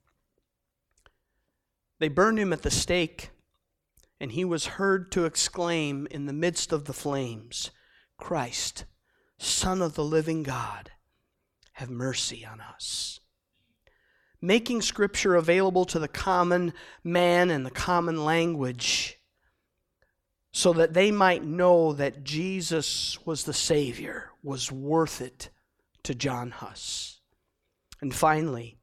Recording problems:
none

